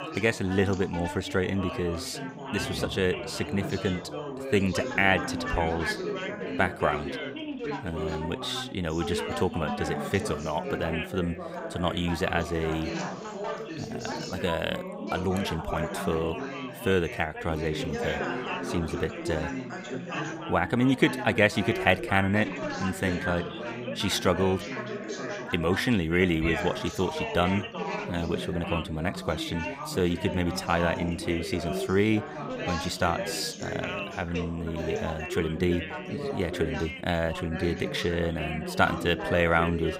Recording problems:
background chatter; loud; throughout; 4 voices, 6 dB below the speech
animal sounds; faint; until 13 s; 20 dB below the speech

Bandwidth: 15.5 kHz